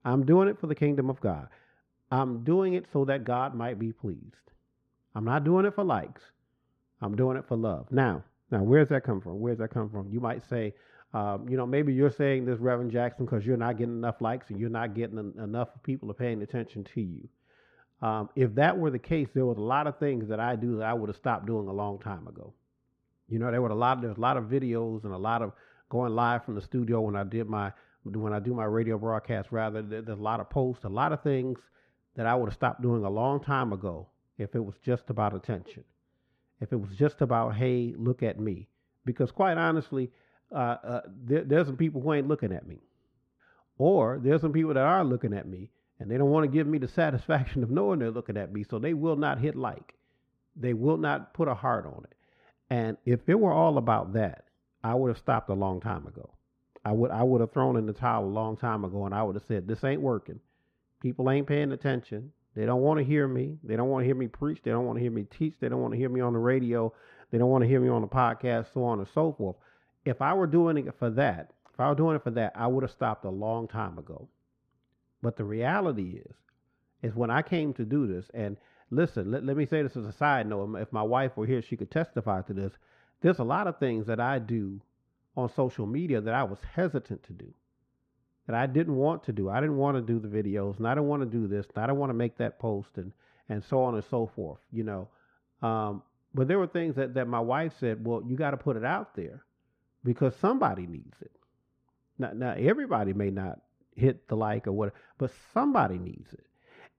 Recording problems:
muffled; very; fading above 3.5 kHz

